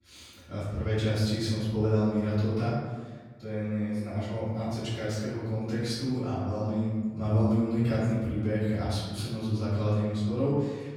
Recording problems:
room echo; strong; dies away in 1.3 s
off-mic speech; far

